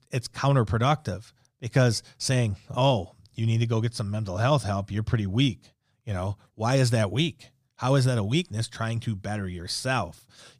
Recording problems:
none

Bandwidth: 15 kHz